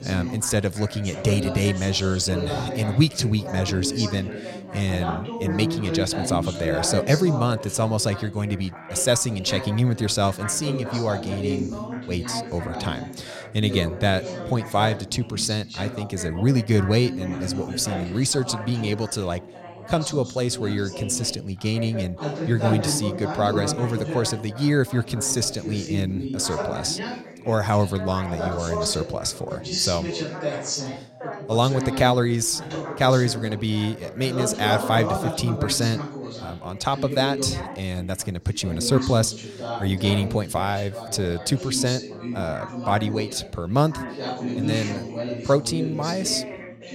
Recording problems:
background chatter; loud; throughout; 4 voices, 7 dB below the speech

